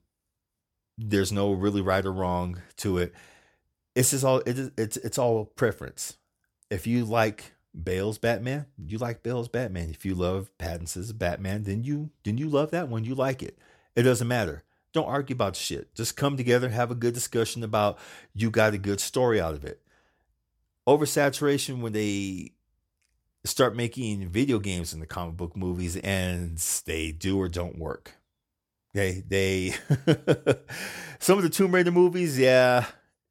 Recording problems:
none

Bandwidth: 18 kHz